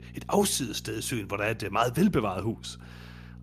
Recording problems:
electrical hum; faint; throughout; 60 Hz, 30 dB below the speech

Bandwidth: 14.5 kHz